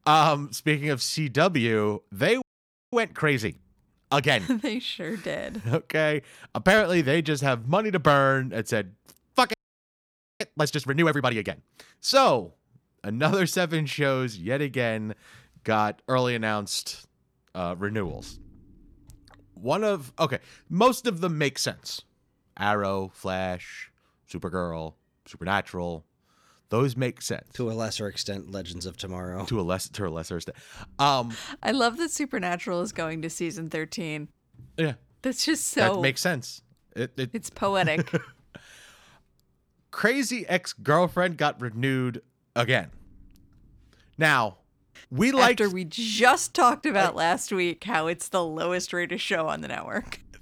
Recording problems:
audio freezing; at 2.5 s for 0.5 s and at 9.5 s for 1 s

